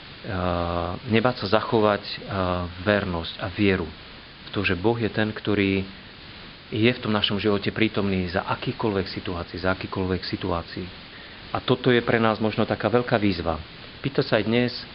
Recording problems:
high frequencies cut off; severe; nothing above 5 kHz
hiss; noticeable; throughout; 15 dB below the speech

